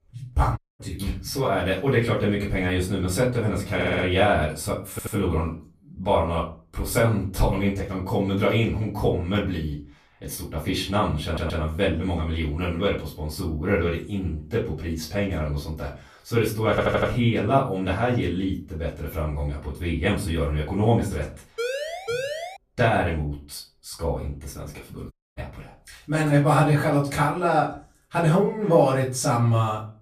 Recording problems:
off-mic speech; far
room echo; slight; dies away in 0.3 s
audio cutting out; at 0.5 s and at 25 s
audio stuttering; 4 times, first at 4 s
siren; noticeable; at 22 s; peak 4 dB below the speech

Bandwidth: 14.5 kHz